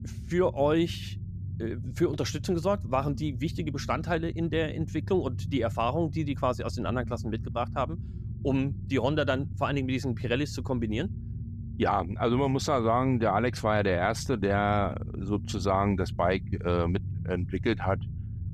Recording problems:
low rumble; faint; throughout; 20 dB below the speech

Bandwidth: 14.5 kHz